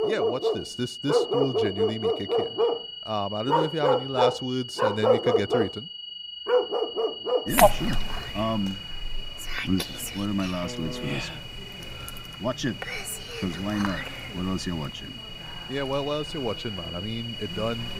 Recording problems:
animal sounds; very loud; throughout; 4 dB above the speech
high-pitched whine; loud; throughout; 3 kHz, 6 dB below the speech

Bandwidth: 15.5 kHz